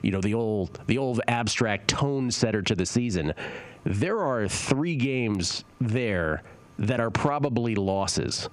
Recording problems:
squashed, flat; heavily

